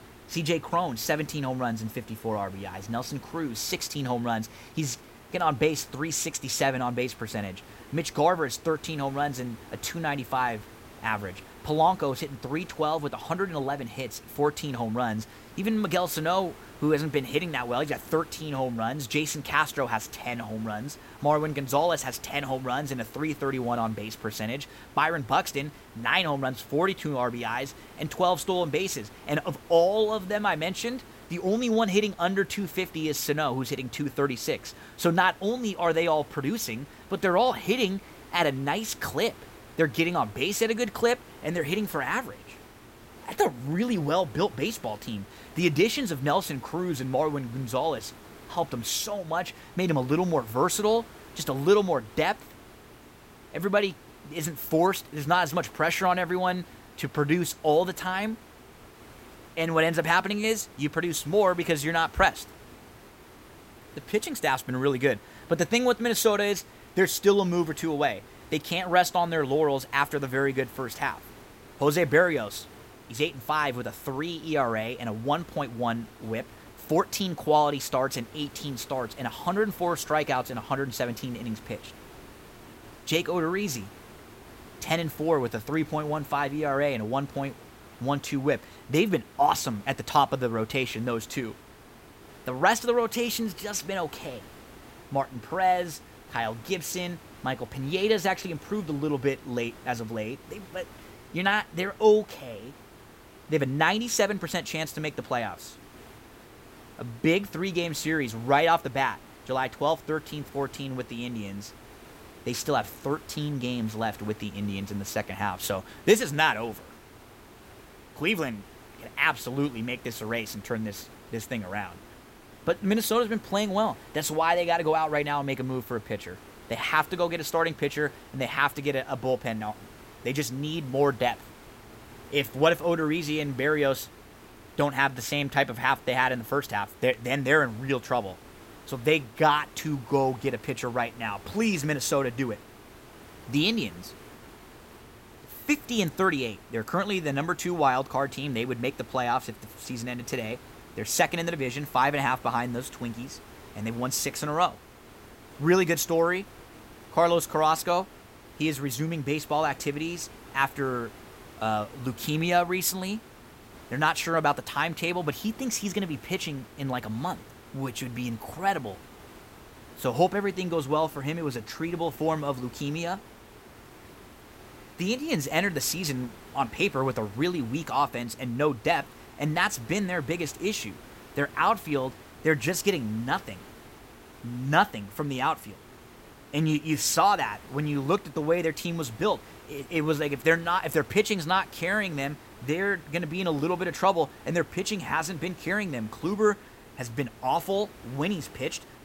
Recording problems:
hiss; faint; throughout; 20 dB below the speech

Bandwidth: 16 kHz